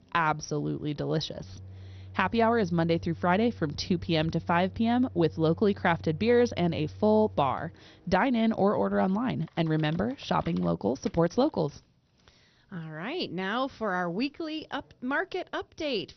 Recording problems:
garbled, watery; slightly; nothing above 6 kHz
household noises; noticeable; until 11 s; 20 dB below the speech

